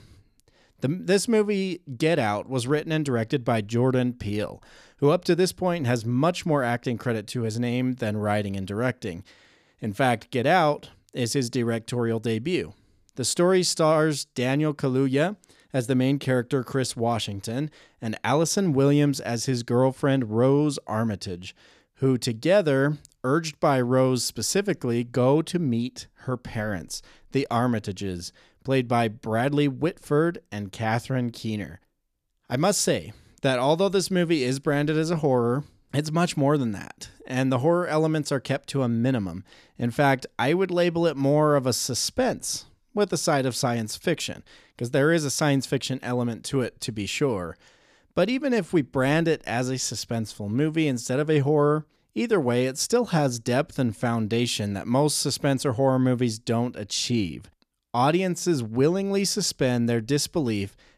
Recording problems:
none

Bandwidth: 14.5 kHz